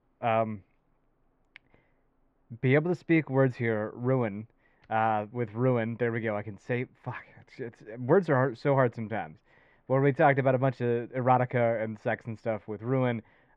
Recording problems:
muffled; very; fading above 1.5 kHz

